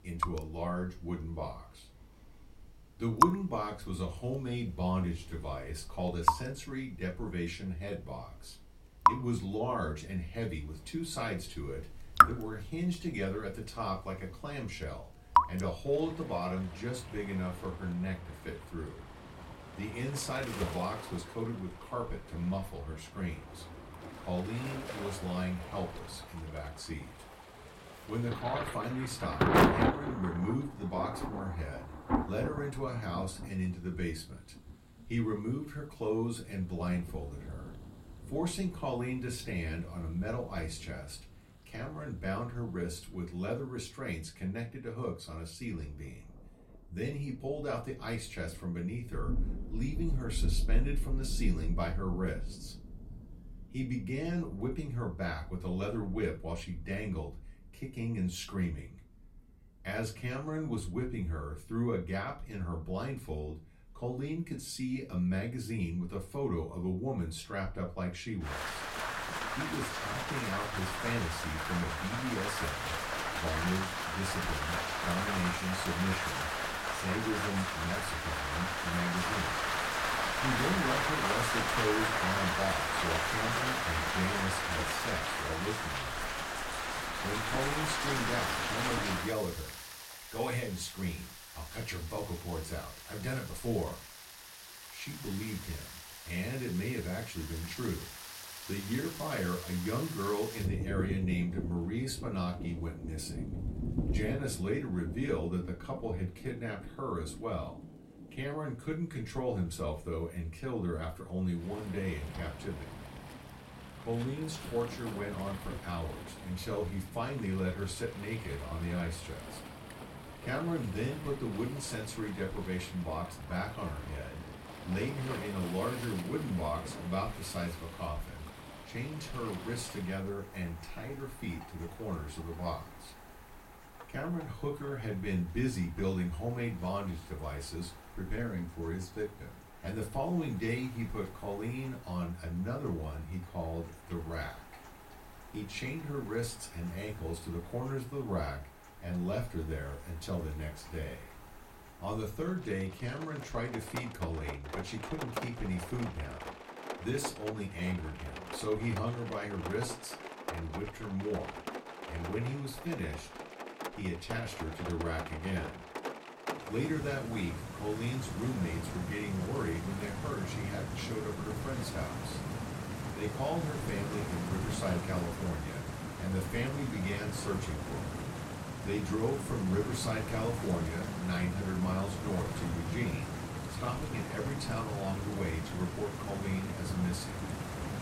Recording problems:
off-mic speech; far
room echo; very slight; dies away in 0.2 s
rain or running water; very loud; throughout; as loud as the speech

